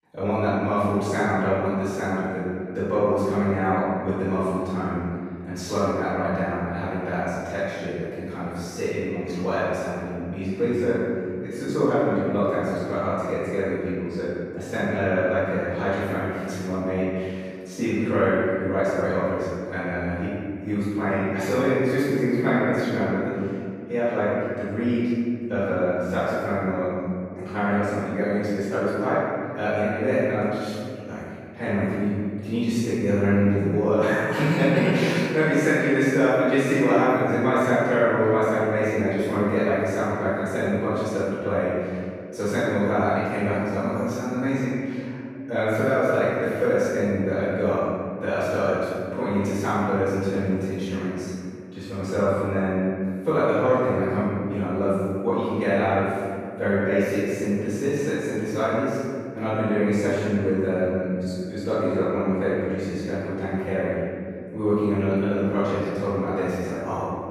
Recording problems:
room echo; strong; dies away in 2.2 s
off-mic speech; far

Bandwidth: 14.5 kHz